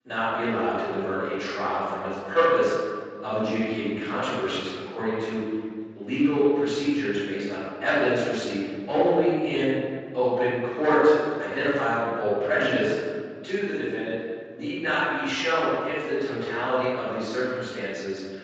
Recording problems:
room echo; strong; dies away in 1.8 s
off-mic speech; far
garbled, watery; slightly; nothing above 7.5 kHz
thin; very slightly; fading below 350 Hz

